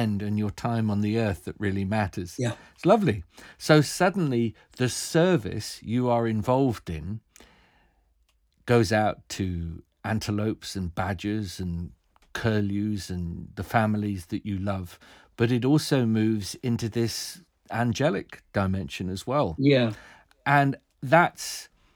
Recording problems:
abrupt cut into speech; at the start

